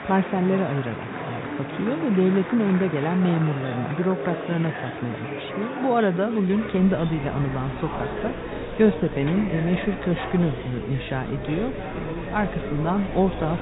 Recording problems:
high frequencies cut off; severe; nothing above 4 kHz
chatter from many people; loud; throughout; 8 dB below the speech
background music; noticeable; throughout; 15 dB below the speech
electrical hum; faint; from 6.5 s on; 50 Hz, 20 dB below the speech

